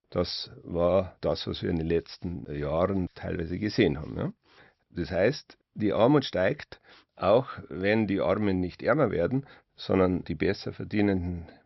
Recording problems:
high frequencies cut off; noticeable; nothing above 5.5 kHz

